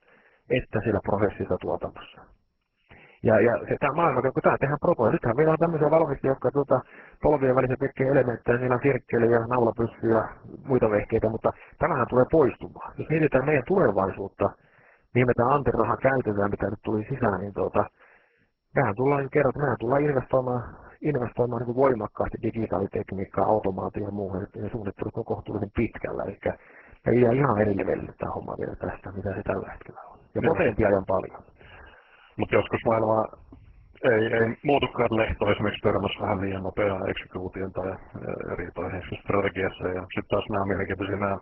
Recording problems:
garbled, watery; badly

